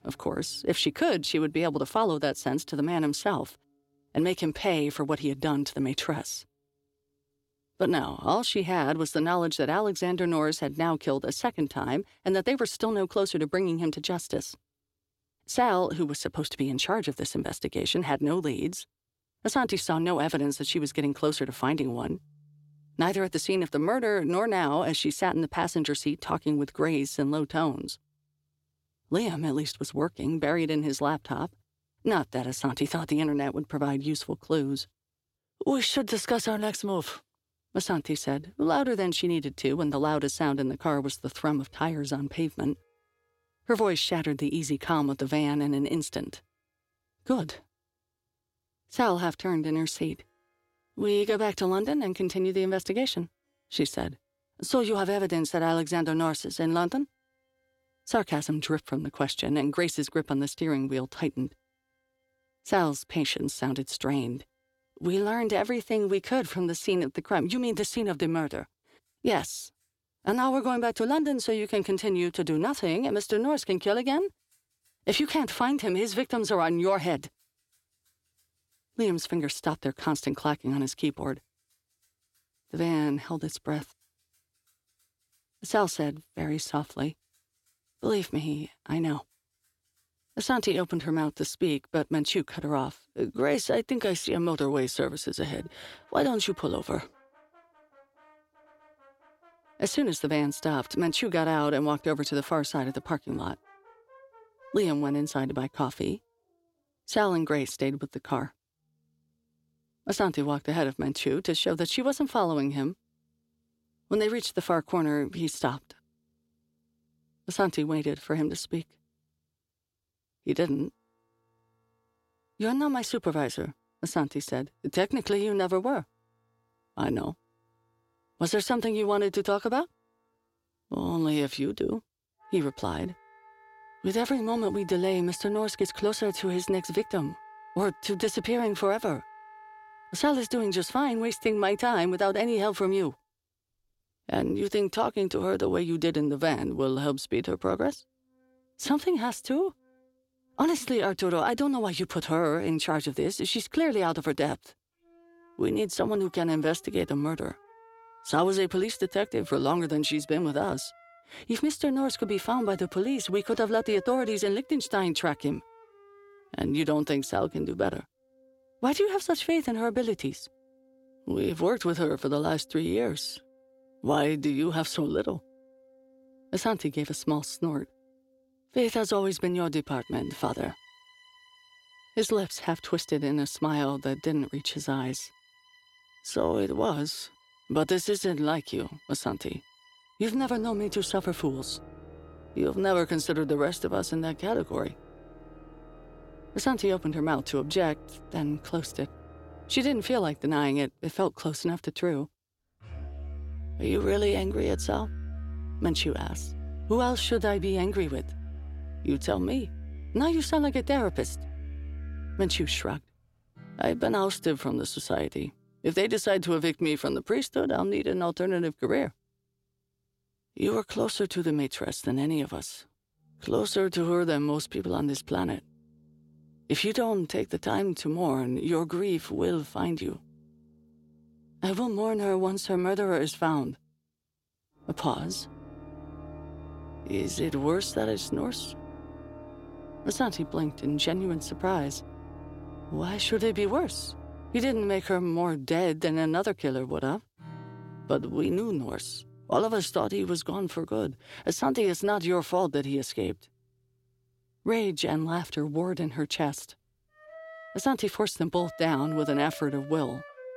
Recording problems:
background music; noticeable; throughout; 20 dB below the speech

